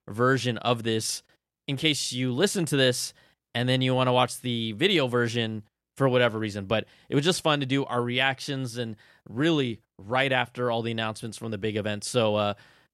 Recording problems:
none

